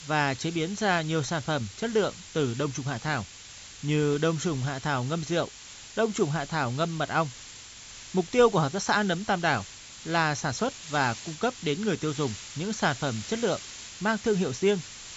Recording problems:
high frequencies cut off; noticeable; nothing above 8 kHz
hiss; noticeable; throughout; 15 dB below the speech

